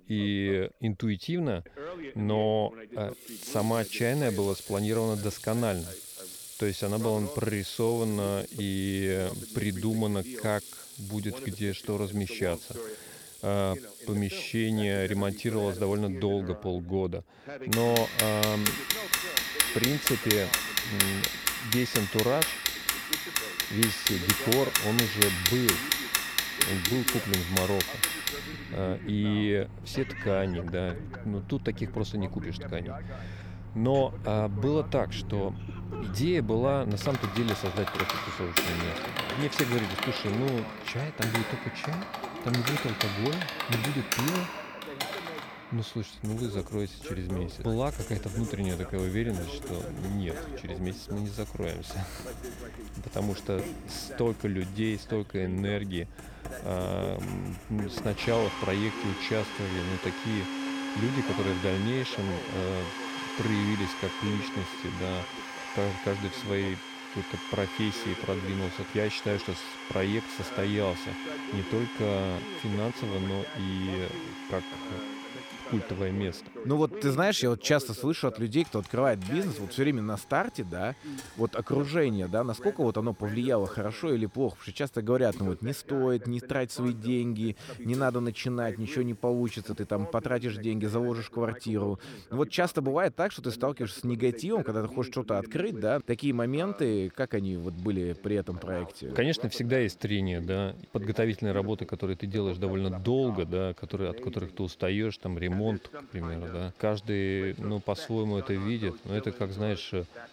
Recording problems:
household noises; loud; throughout; 2 dB below the speech
voice in the background; noticeable; throughout; 15 dB below the speech

